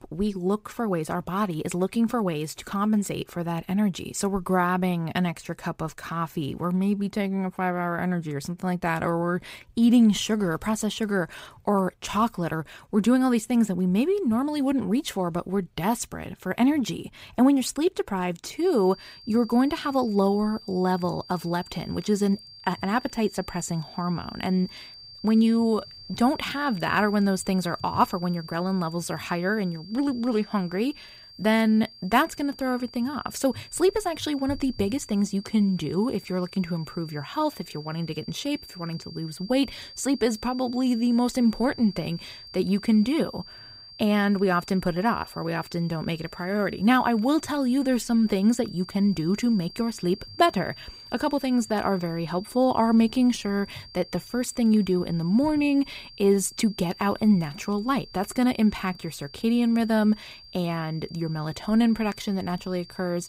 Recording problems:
high-pitched whine; noticeable; from 19 s on; 4.5 kHz, 20 dB below the speech

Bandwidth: 15.5 kHz